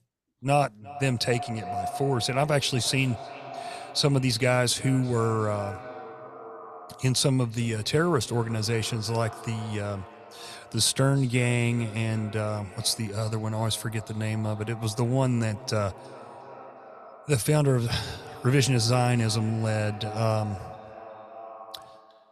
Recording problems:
echo of what is said; noticeable; throughout; 360 ms later, 15 dB below the speech

